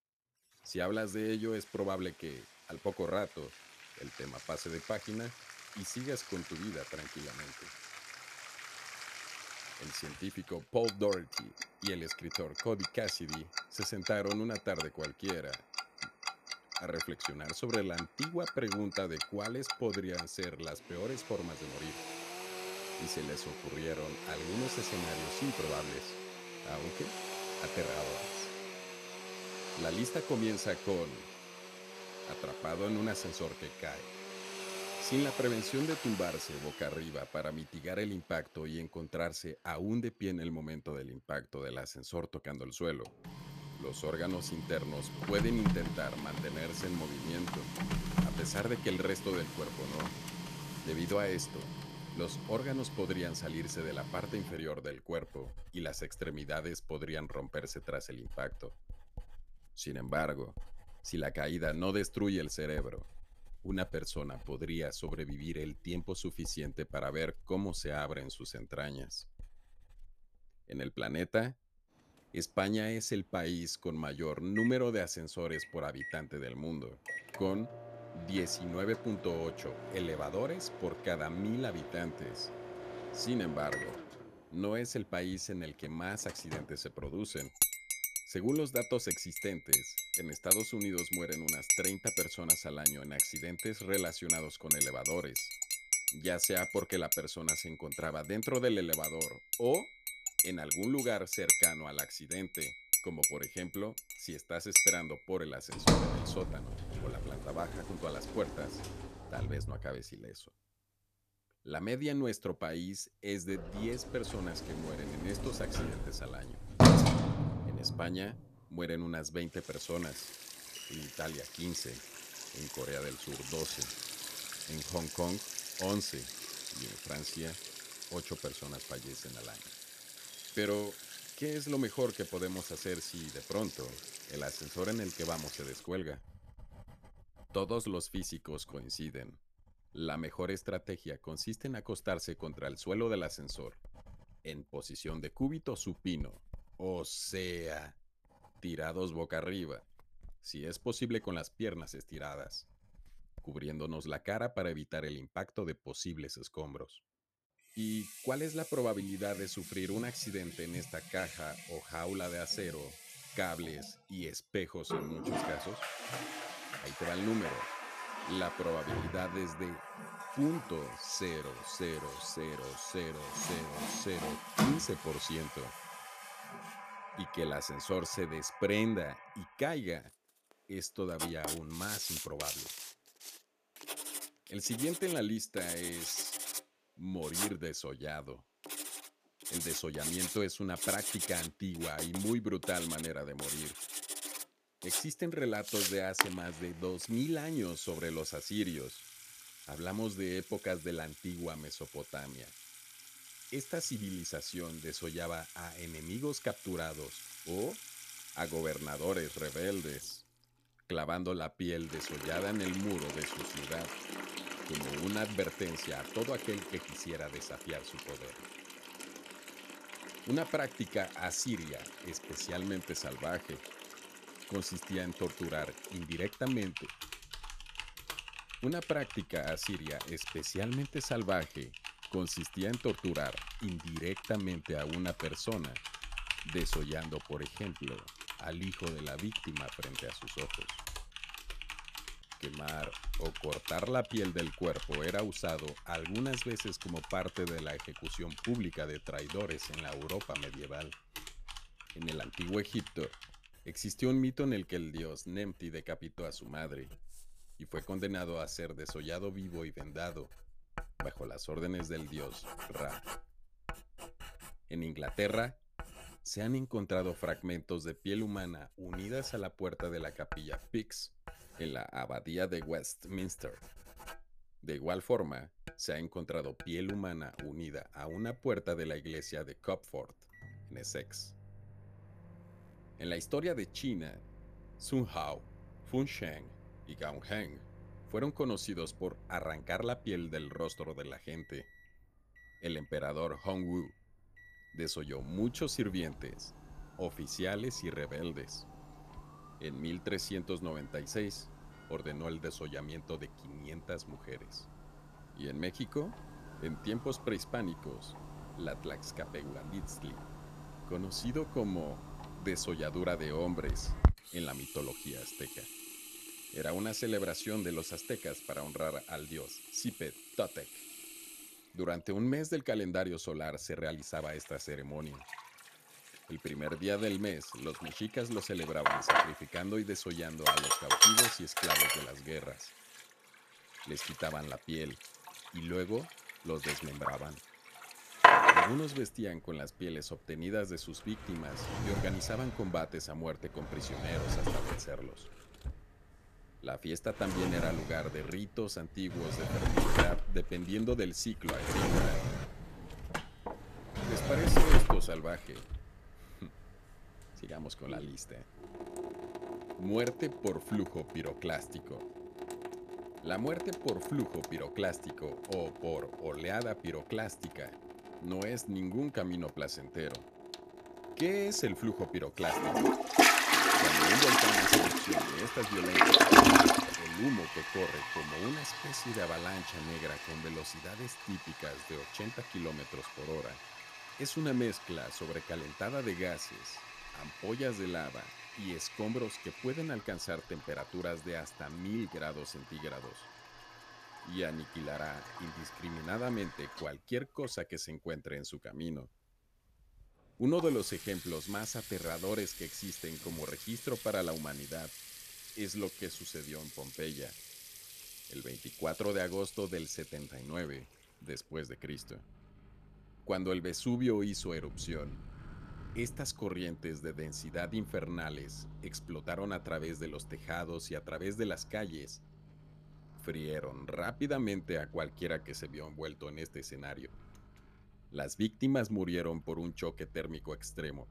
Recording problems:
household noises; very loud; throughout; 3 dB above the speech

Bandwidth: 14.5 kHz